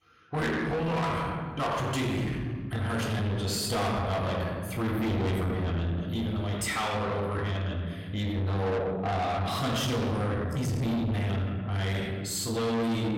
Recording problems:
distortion; heavy; 7 dB below the speech
off-mic speech; far
room echo; noticeable; dies away in 1.3 s

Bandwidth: 16.5 kHz